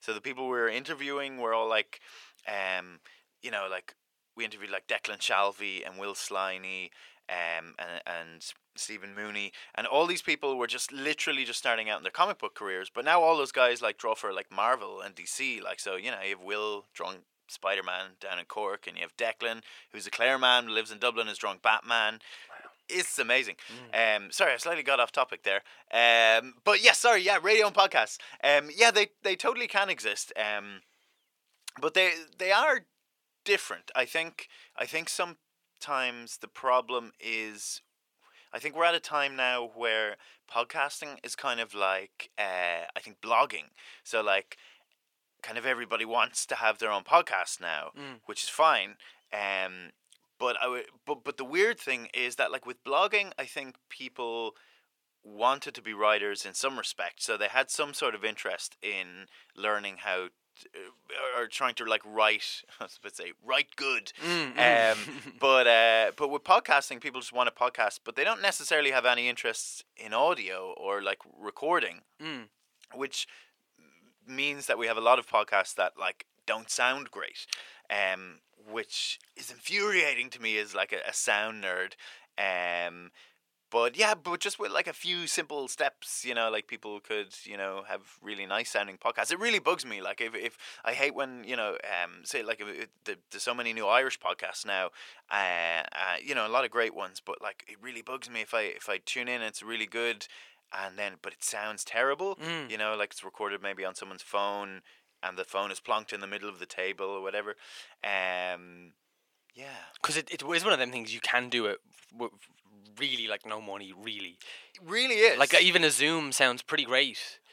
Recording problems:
thin; very; fading below 650 Hz

